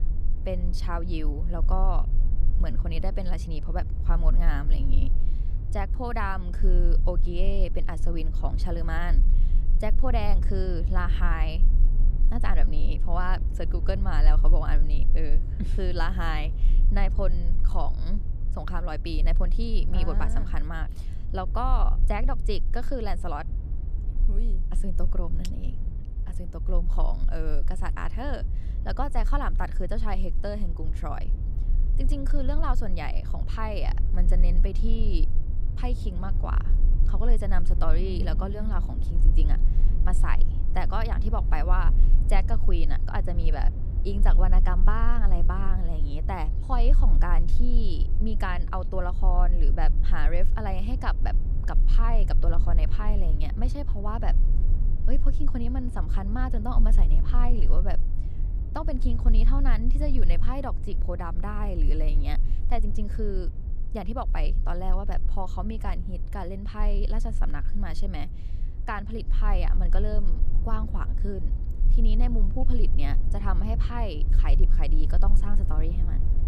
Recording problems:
low rumble; noticeable; throughout; 10 dB below the speech

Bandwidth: 14 kHz